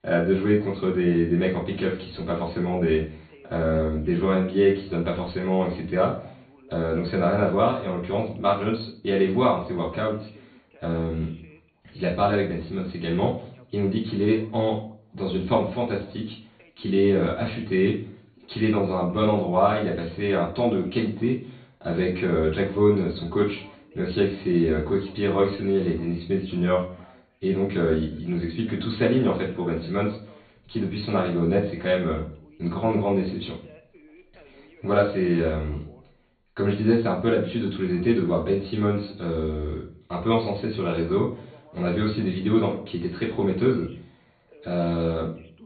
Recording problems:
off-mic speech; far
high frequencies cut off; severe; nothing above 4.5 kHz
room echo; slight; dies away in 0.4 s
voice in the background; faint; throughout; 30 dB below the speech

